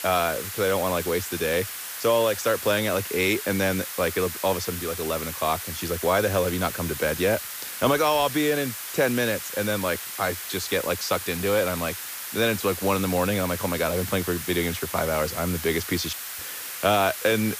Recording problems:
hiss; loud; throughout; 7 dB below the speech

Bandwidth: 15 kHz